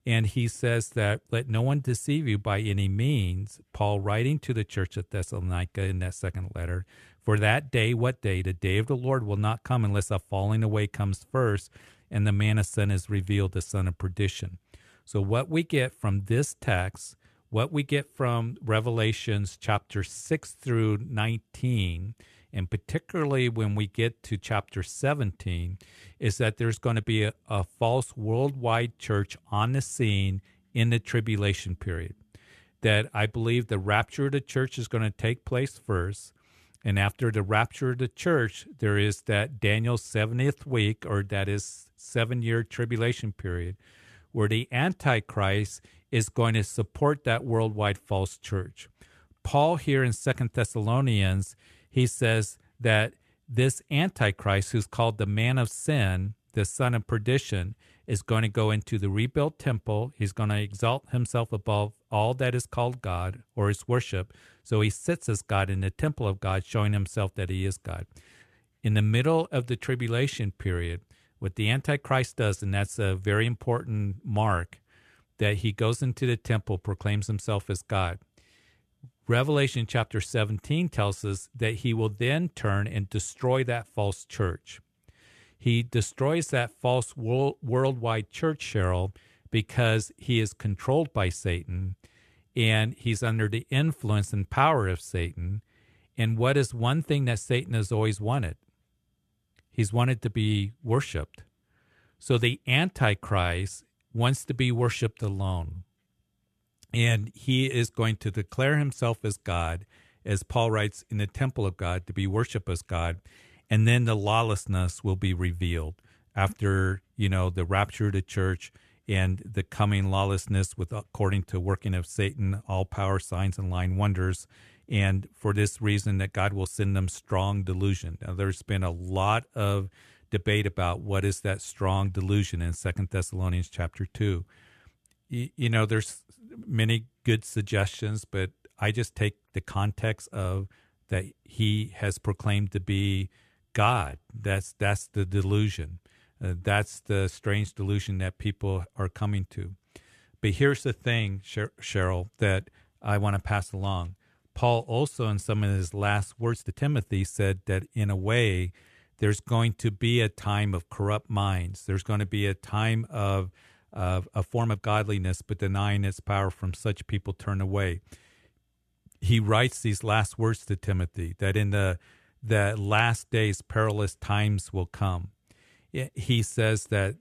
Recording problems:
uneven, jittery; strongly; from 27 s to 2:45

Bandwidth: 13.5 kHz